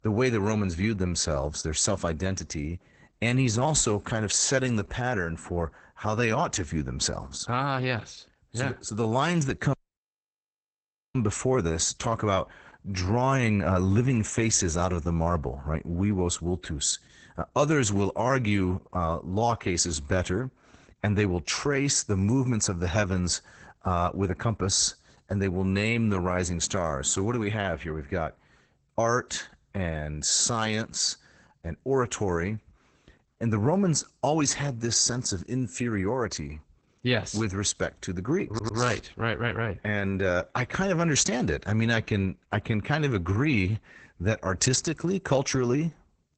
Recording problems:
garbled, watery; badly; nothing above 8 kHz
audio cutting out; at 9.5 s for 1.5 s
audio stuttering; at 38 s

